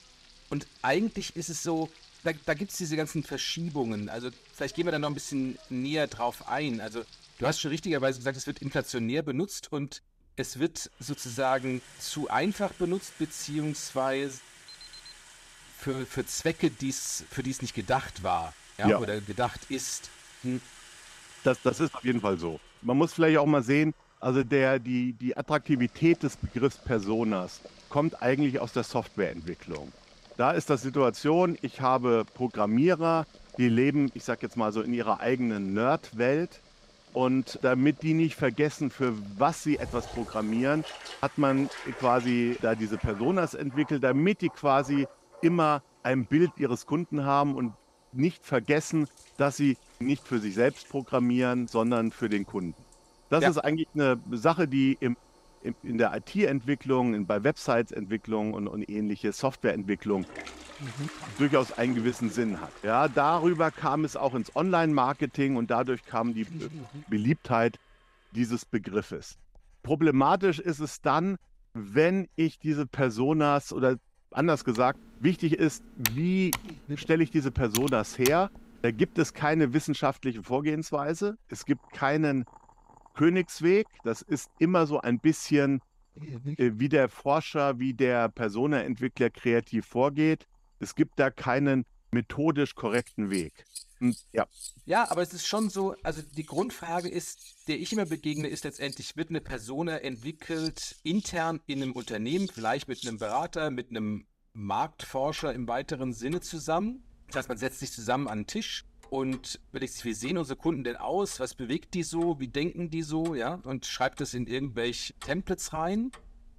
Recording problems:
household noises; faint; throughout; 20 dB below the speech
alarm; faint; at 15 s; peak 20 dB below the speech
keyboard typing; noticeable; from 1:15 to 1:18; peak 2 dB below the speech

